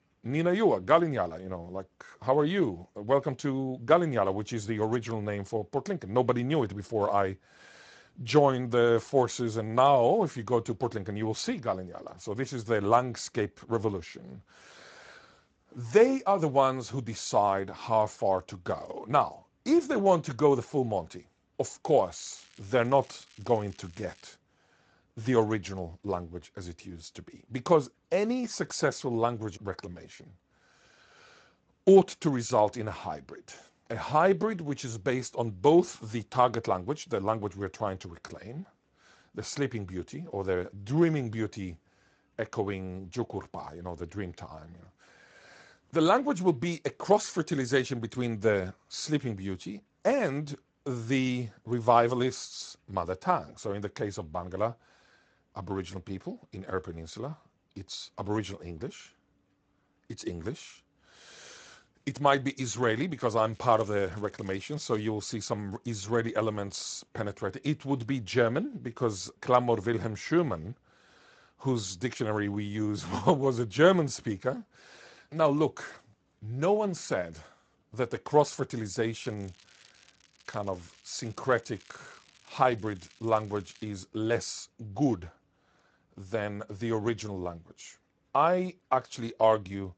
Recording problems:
garbled, watery; slightly; nothing above 7.5 kHz
crackling; faint; from 22 to 24 s, from 1:04 to 1:05 and from 1:19 to 1:24; 30 dB below the speech

